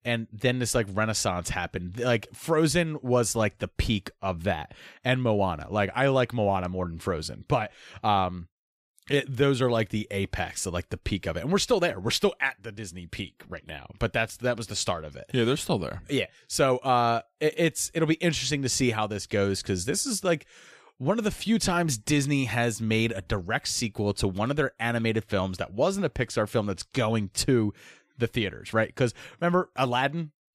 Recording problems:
none

